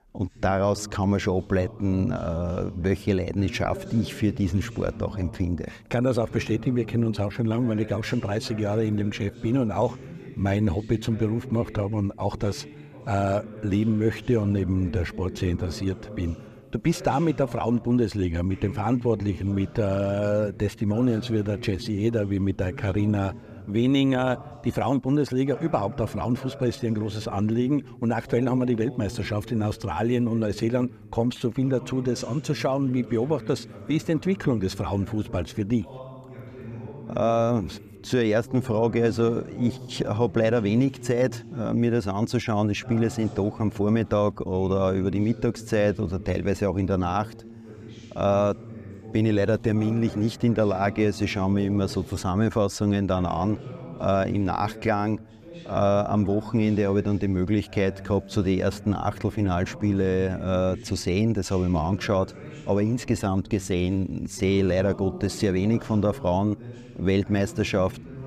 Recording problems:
voice in the background; noticeable; throughout; 15 dB below the speech

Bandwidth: 14.5 kHz